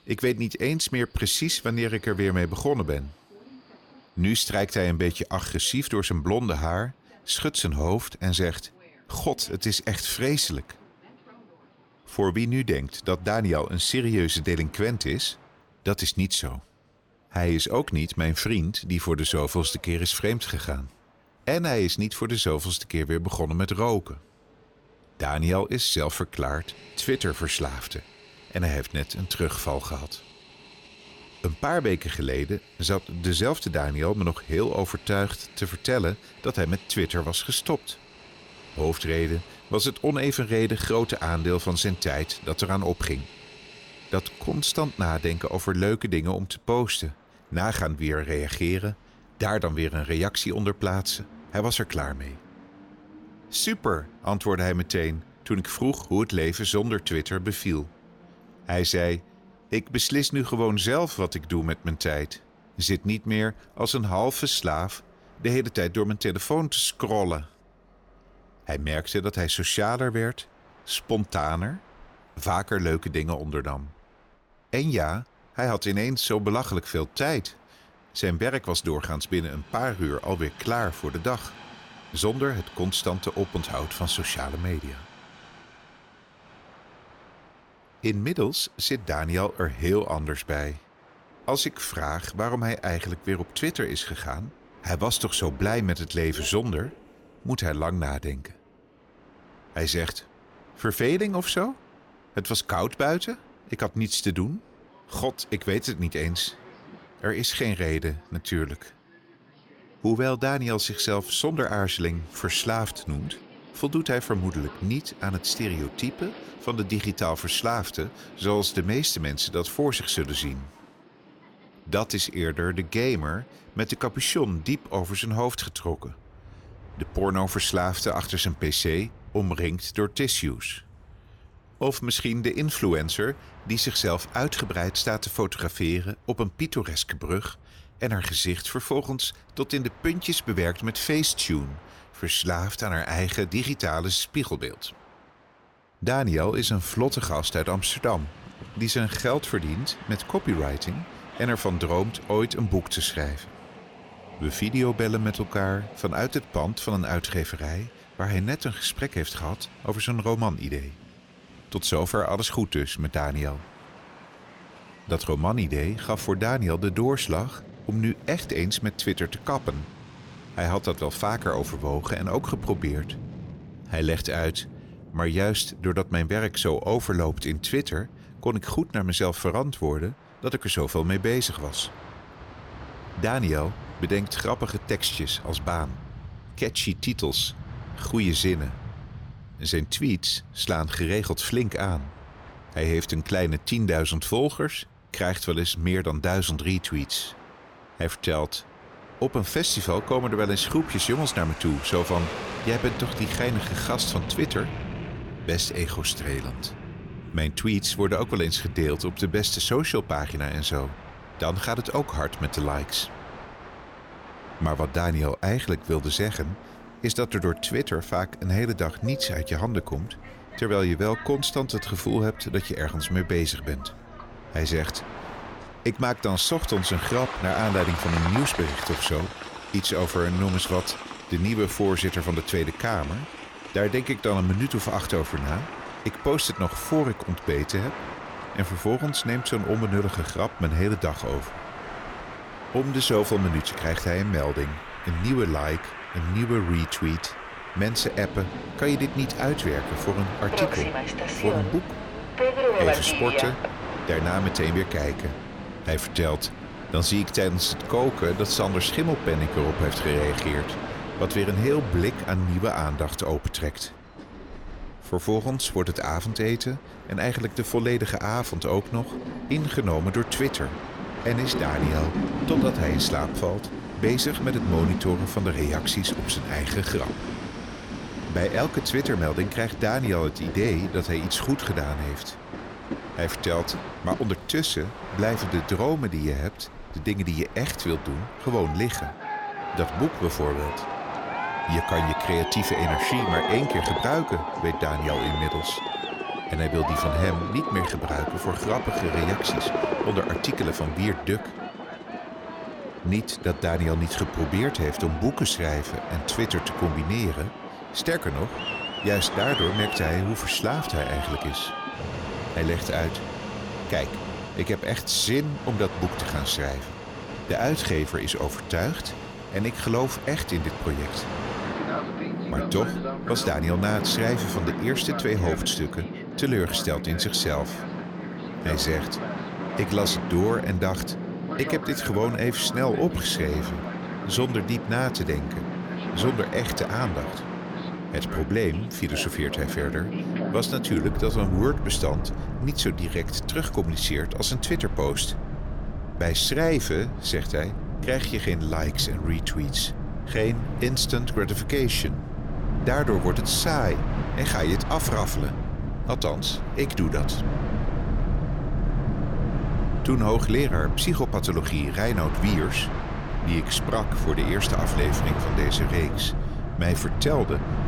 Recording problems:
train or aircraft noise; loud; throughout; 7 dB below the speech

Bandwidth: 18.5 kHz